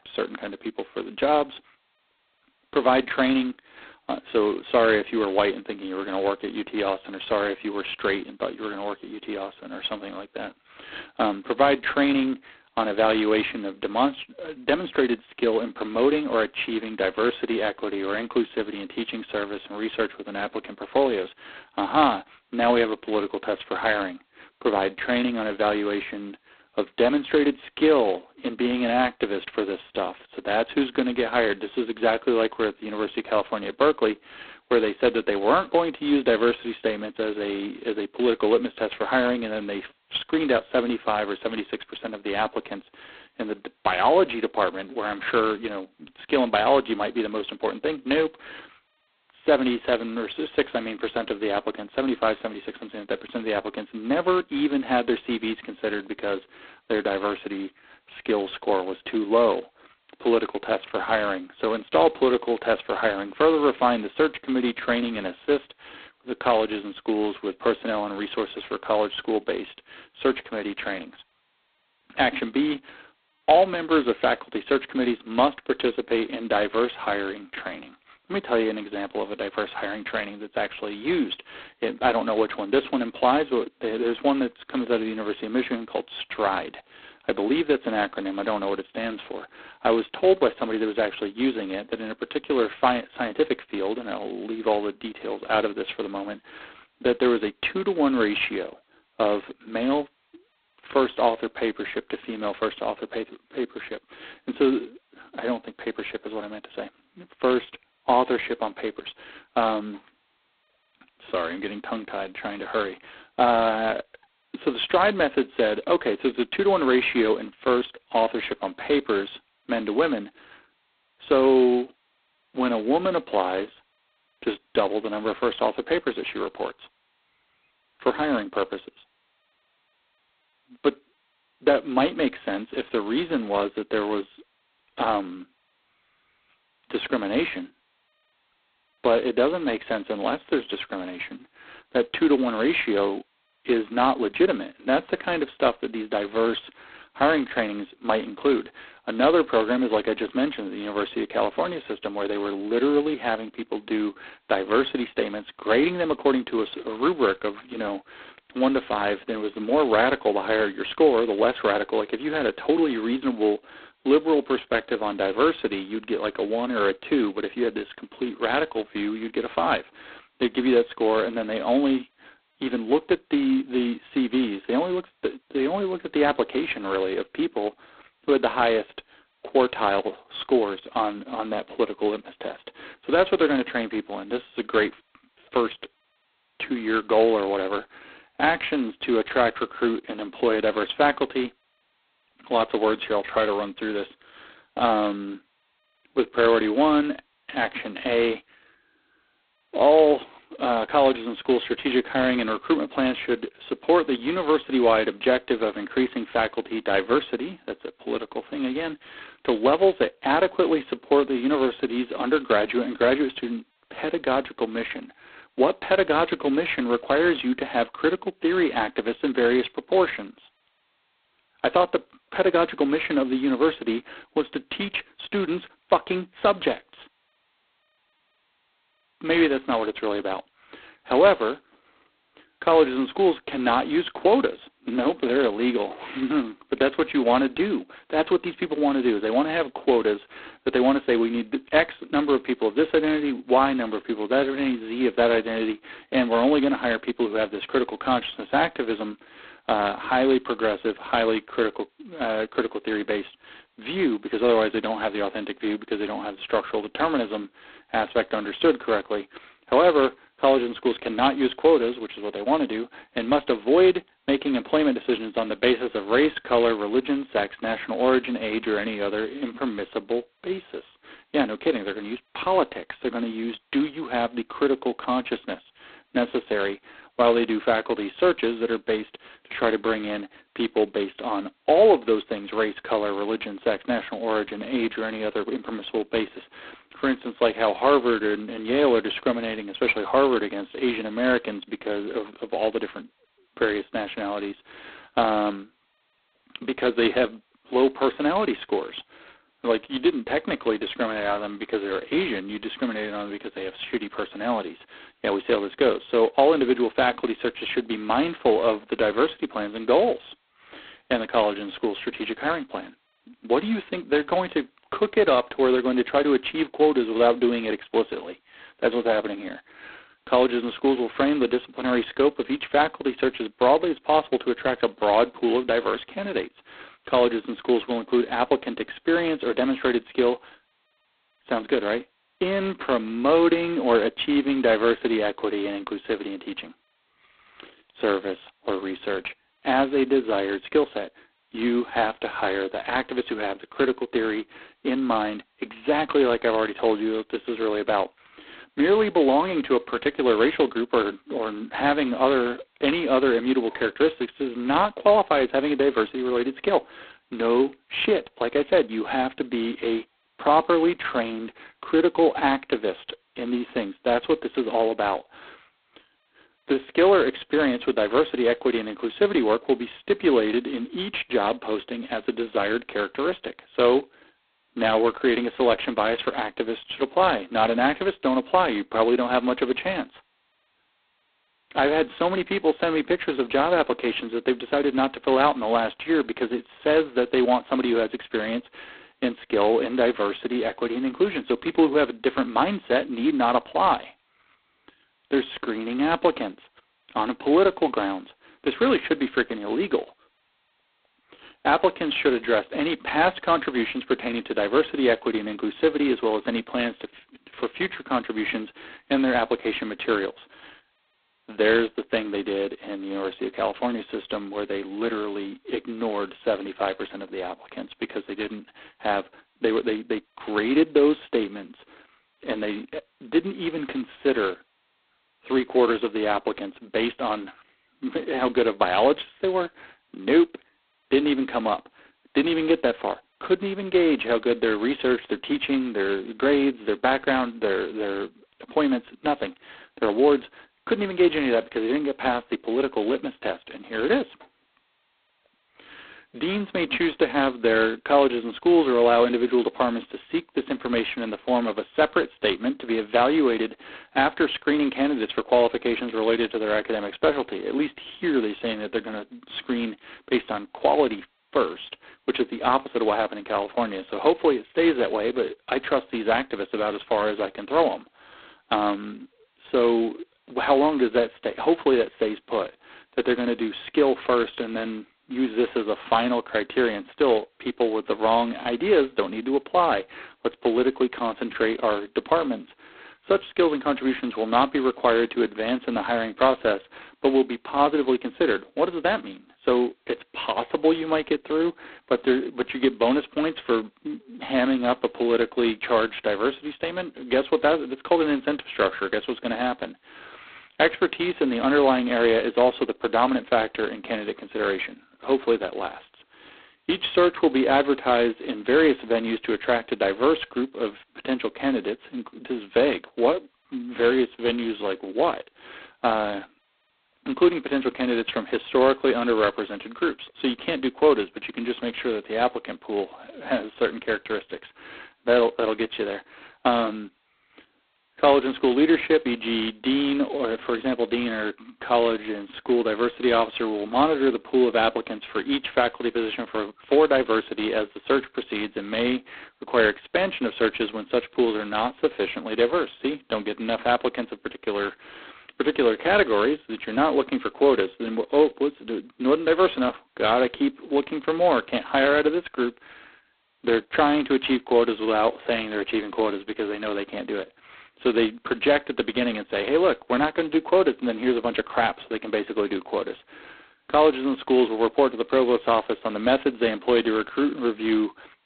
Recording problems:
phone-call audio; poor line; nothing above 4 kHz

